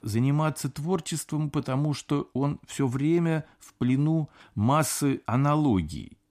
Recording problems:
none

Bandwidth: 14.5 kHz